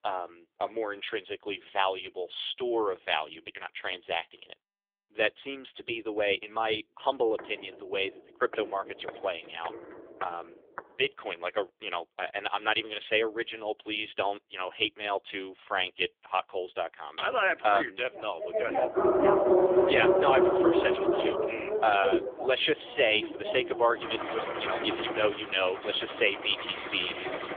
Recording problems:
phone-call audio; poor line; nothing above 3.5 kHz
traffic noise; loud; from 19 s on; 4 dB below the speech
footsteps; faint; from 7.5 to 11 s; peak 15 dB below the speech
dog barking; loud; from 19 to 22 s; peak 8 dB above the speech

